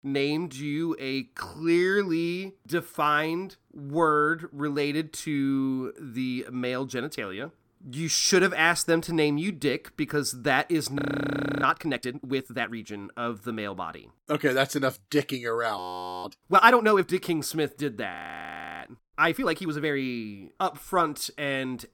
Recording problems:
audio freezing; at 11 s for 0.5 s, at 16 s and at 18 s for 0.5 s

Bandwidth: 17 kHz